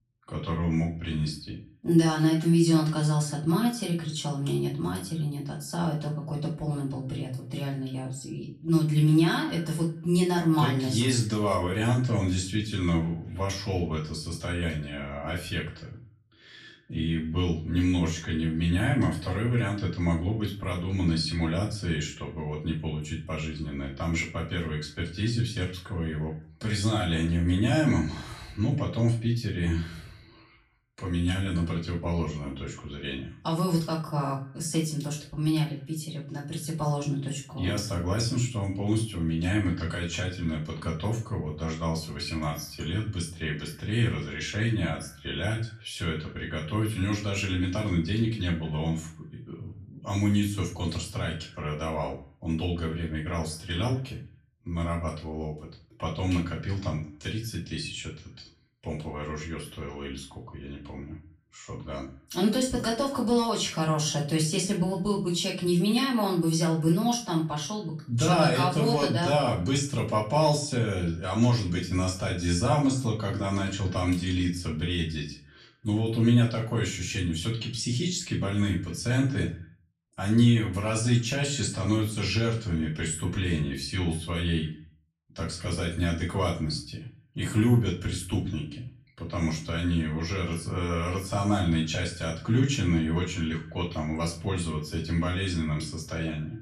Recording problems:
off-mic speech; far
echo of what is said; faint; throughout; 90 ms later, 25 dB below the speech
room echo; slight; dies away in 0.3 s

